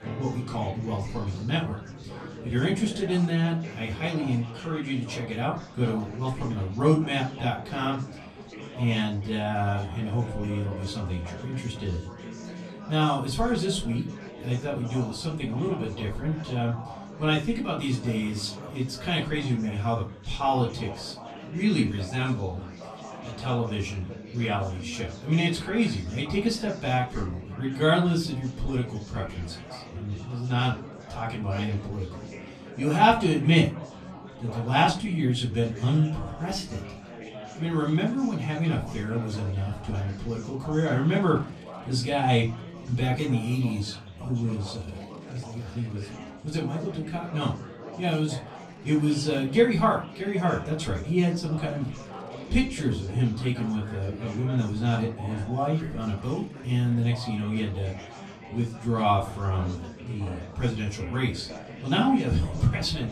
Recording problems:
off-mic speech; far
room echo; slight; dies away in 0.3 s
chatter from many people; noticeable; throughout; 15 dB below the speech
background music; faint; throughout; 20 dB below the speech

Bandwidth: 13.5 kHz